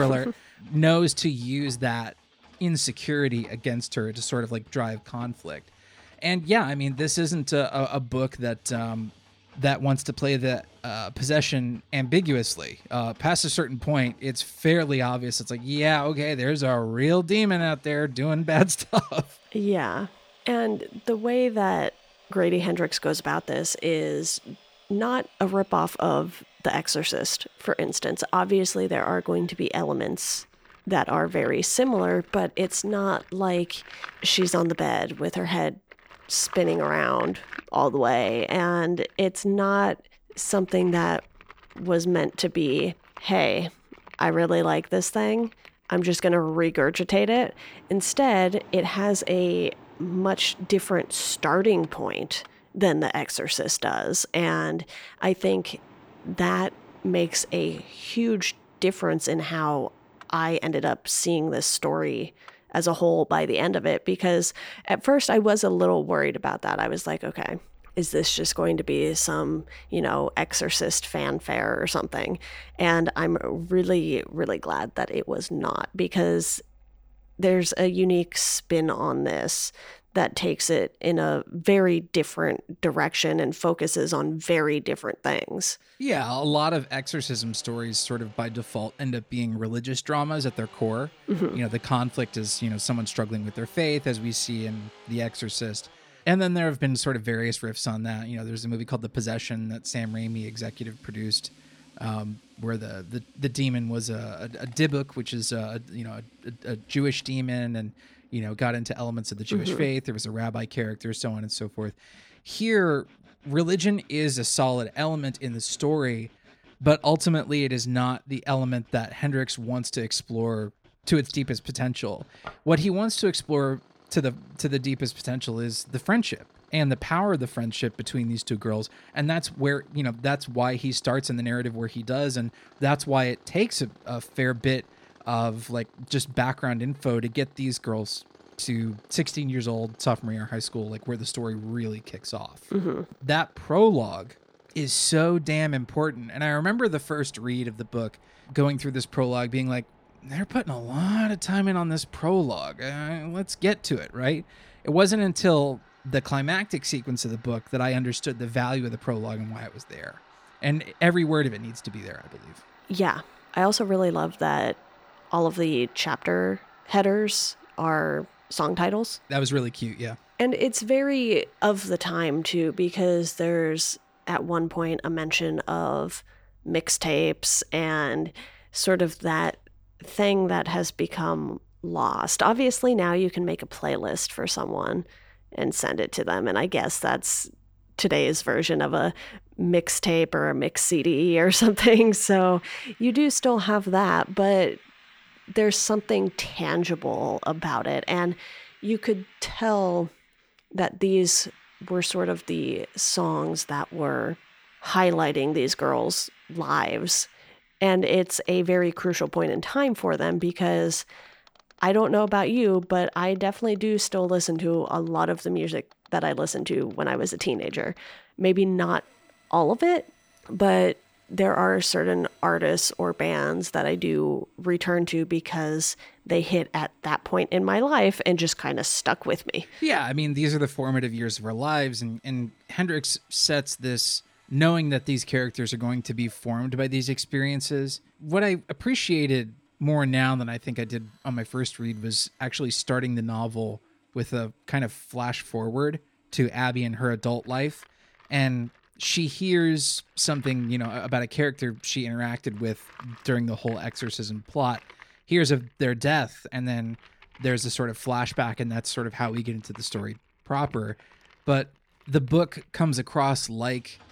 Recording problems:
machinery noise; faint; throughout; 30 dB below the speech
abrupt cut into speech; at the start

